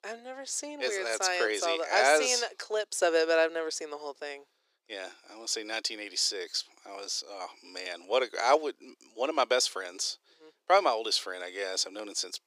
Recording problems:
thin; very; fading below 350 Hz

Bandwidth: 15 kHz